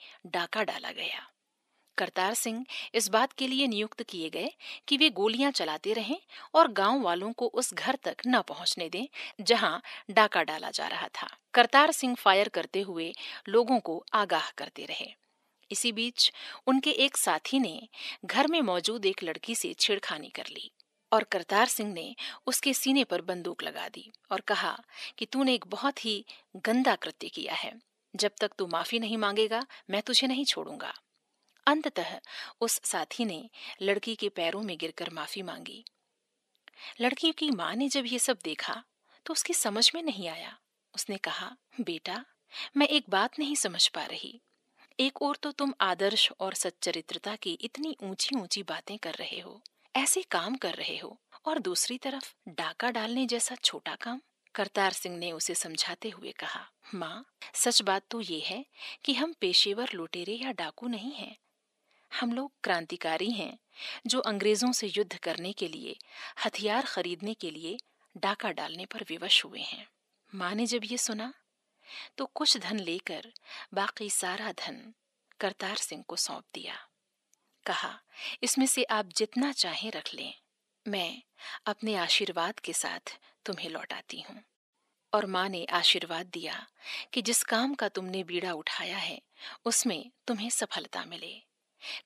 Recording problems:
thin; somewhat; fading below 550 Hz

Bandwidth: 14 kHz